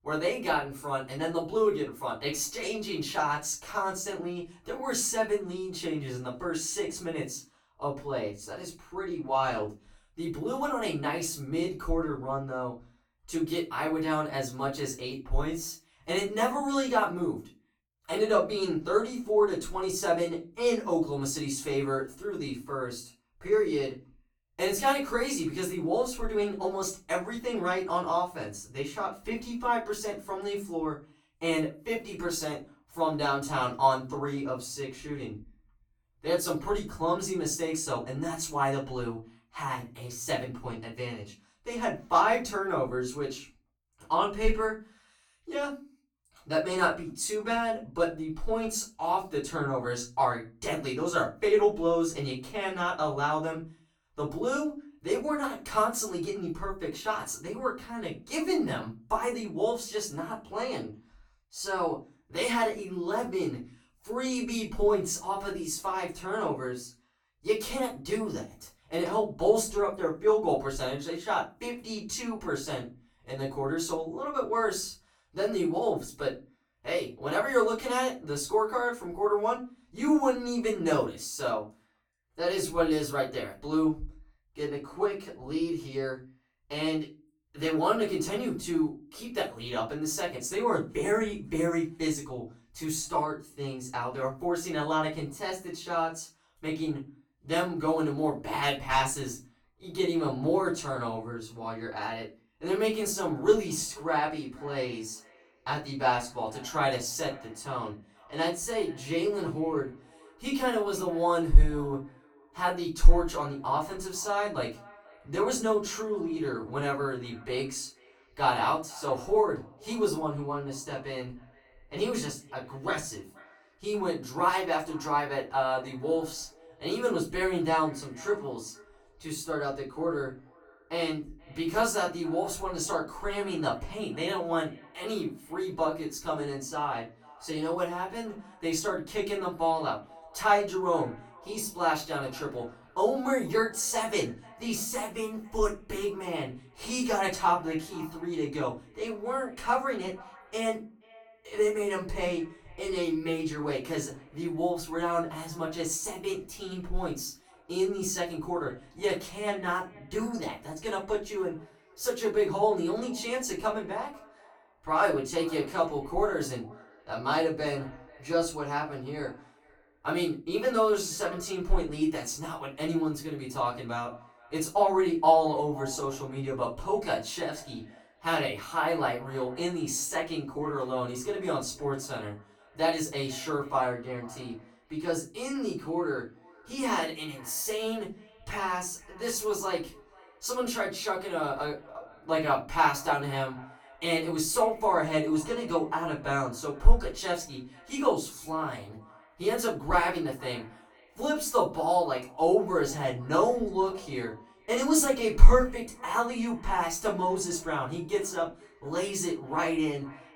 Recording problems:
off-mic speech; far
echo of what is said; faint; from 1:44 on; 480 ms later, 25 dB below the speech
room echo; slight; dies away in 0.3 s

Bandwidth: 18 kHz